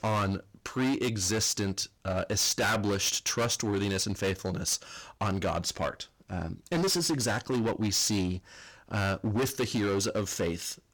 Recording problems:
distortion; heavy; 16% of the sound clipped

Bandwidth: 18 kHz